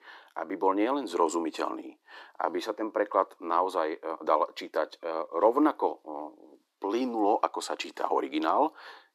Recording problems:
thin; somewhat; fading below 300 Hz
uneven, jittery; slightly; from 0.5 to 8 s

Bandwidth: 14.5 kHz